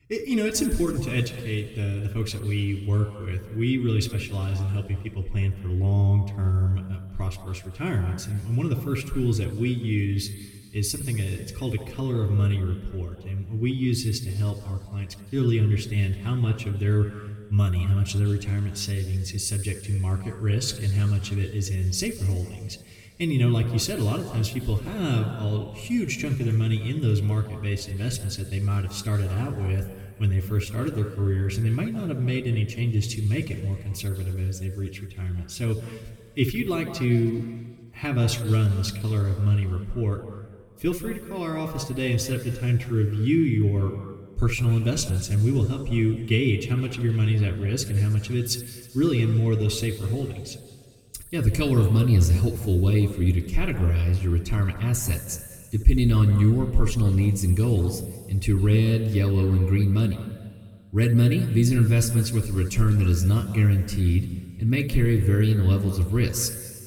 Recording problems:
room echo; noticeable; dies away in 1.9 s
off-mic speech; somewhat distant

